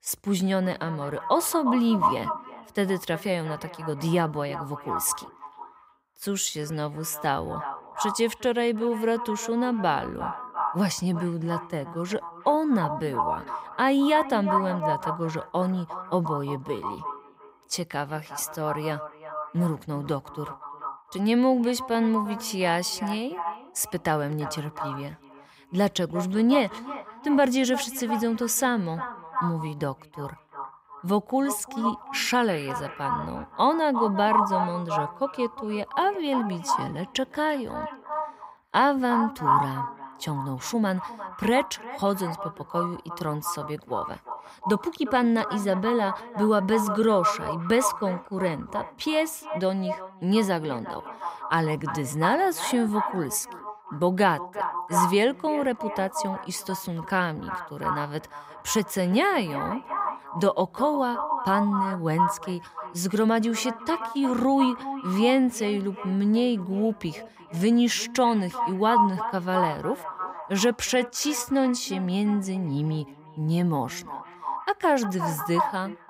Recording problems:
echo of what is said; strong; throughout; 350 ms later, 6 dB below the speech

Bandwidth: 15.5 kHz